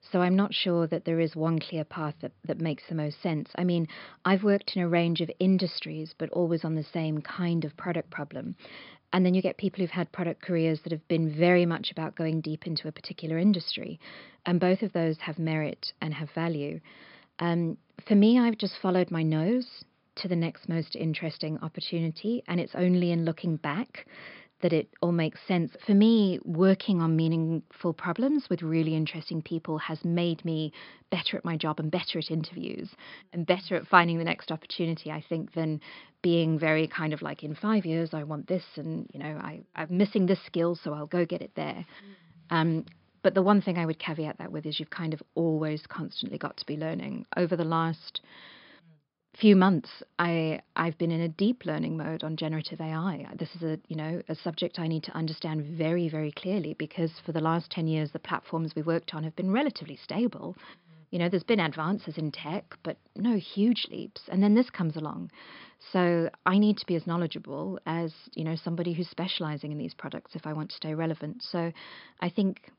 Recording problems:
high frequencies cut off; noticeable; nothing above 5.5 kHz

